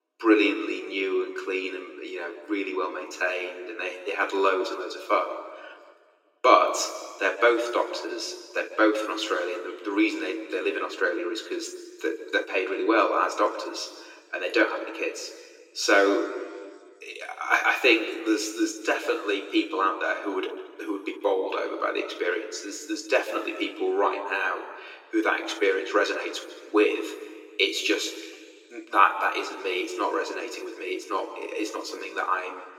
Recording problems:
thin; very; fading below 300 Hz
room echo; slight; dies away in 1.7 s
off-mic speech; somewhat distant

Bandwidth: 16 kHz